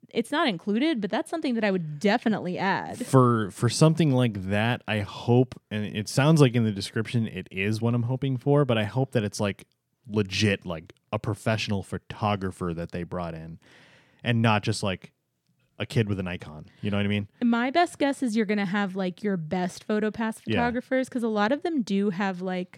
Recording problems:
none

